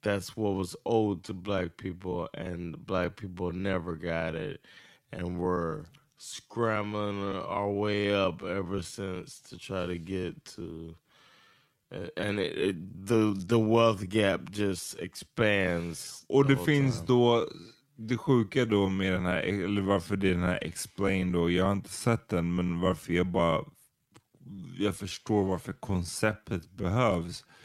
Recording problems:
wrong speed, natural pitch; too slow; 0.6 times normal speed

